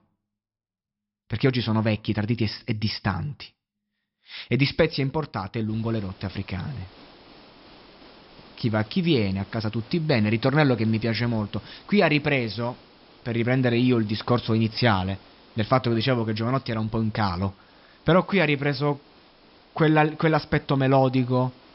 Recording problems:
high frequencies cut off; noticeable; nothing above 5.5 kHz
hiss; faint; from 5.5 s on; 25 dB below the speech

